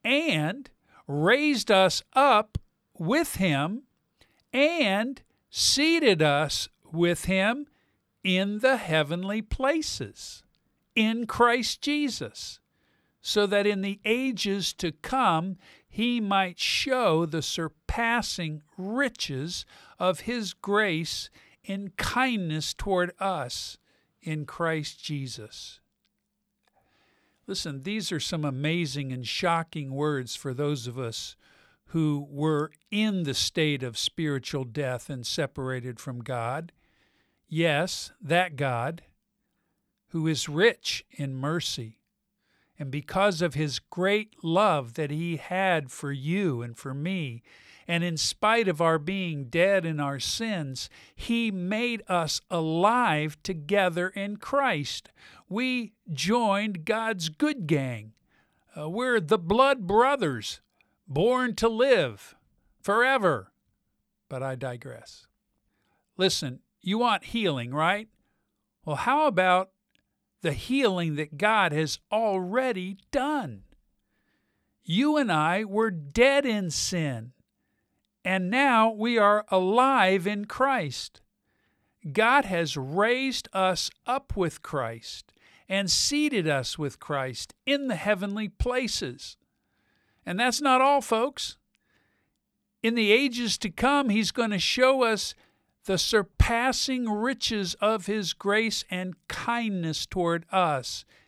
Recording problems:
none

